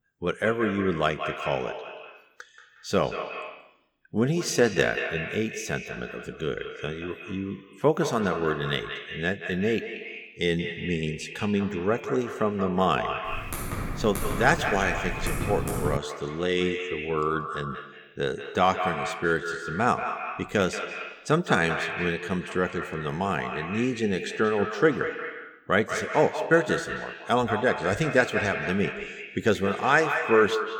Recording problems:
echo of what is said; strong; throughout; 180 ms later, 7 dB below the speech
keyboard typing; noticeable; from 13 to 16 s; peak 3 dB below the speech

